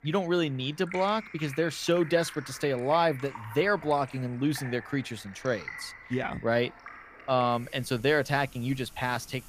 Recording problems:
rain or running water; noticeable; throughout; 15 dB below the speech

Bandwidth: 15 kHz